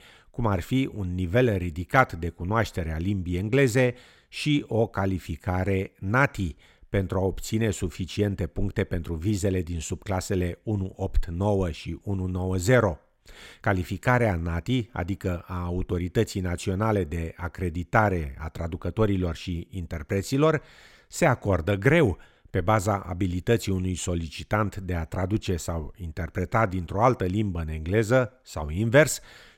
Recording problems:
none

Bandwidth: 16 kHz